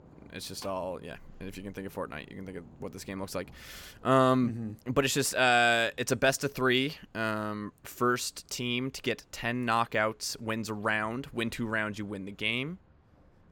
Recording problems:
rain or running water; faint; throughout; 30 dB below the speech

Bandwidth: 17.5 kHz